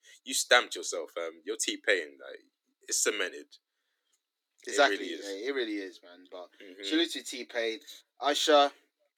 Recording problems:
thin; very slightly; fading below 300 Hz

